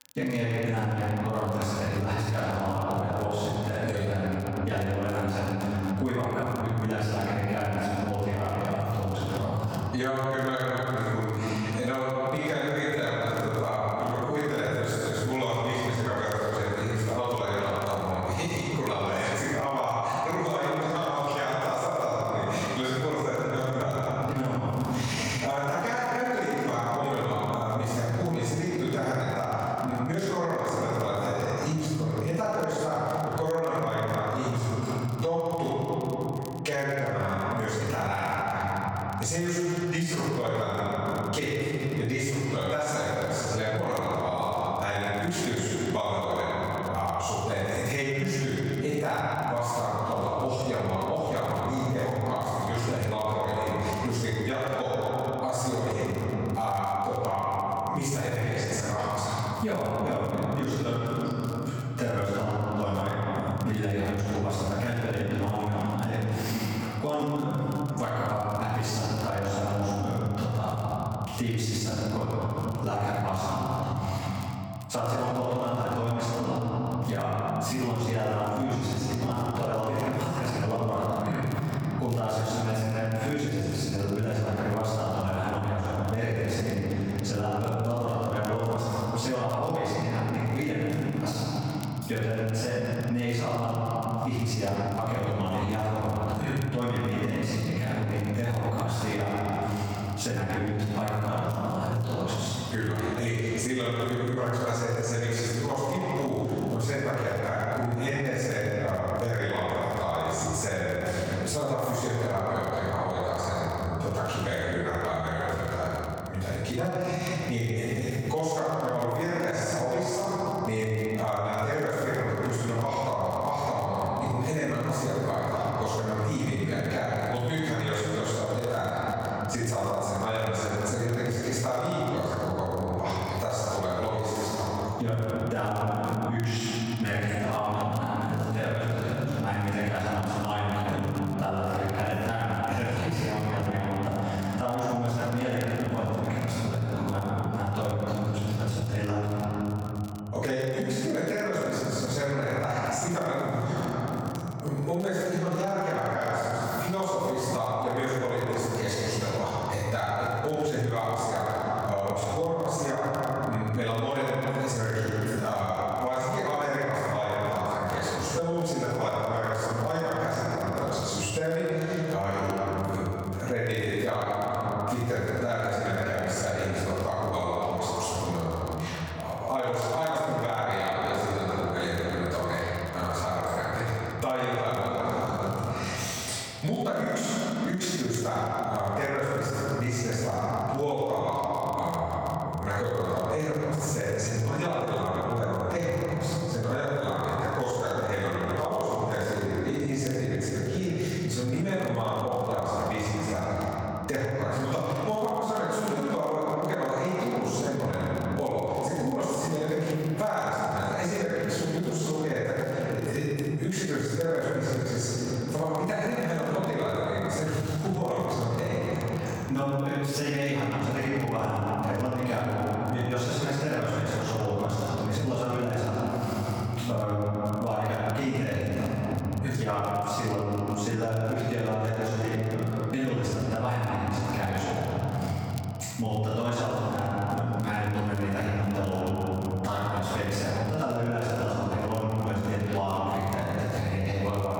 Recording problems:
room echo; strong; dies away in 2.1 s
off-mic speech; far
squashed, flat; heavily
echo of what is said; faint; throughout; 360 ms later, 20 dB below the speech
crackle, like an old record; very faint; 25 dB below the speech

